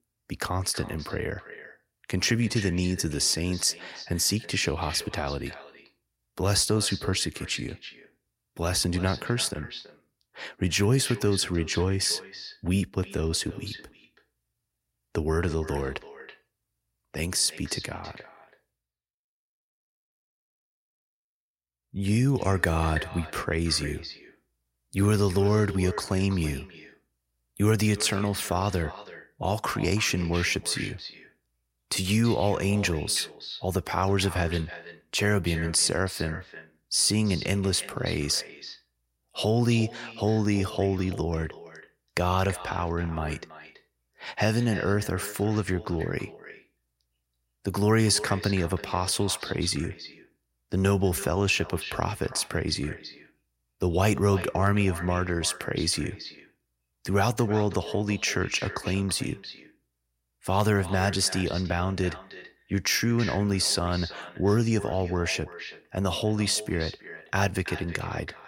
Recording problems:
echo of what is said; noticeable; throughout; 330 ms later, 15 dB below the speech

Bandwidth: 16 kHz